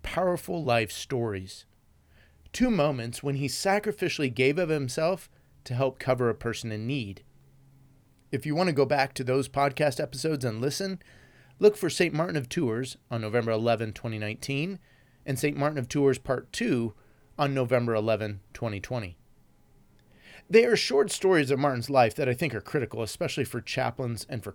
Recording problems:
none

